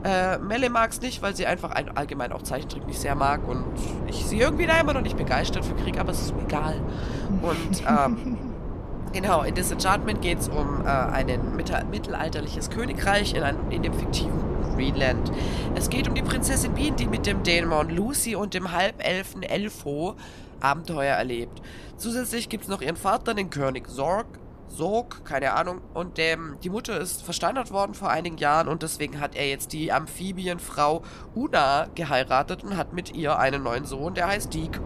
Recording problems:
wind noise on the microphone; occasional gusts; 10 dB below the speech

